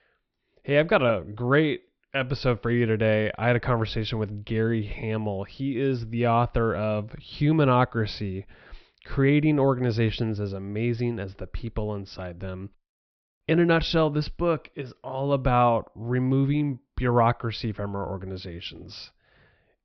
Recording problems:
high frequencies cut off; noticeable; nothing above 5.5 kHz

